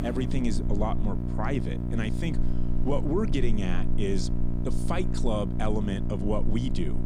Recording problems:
electrical hum; loud; throughout; 60 Hz, 6 dB below the speech

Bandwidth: 15.5 kHz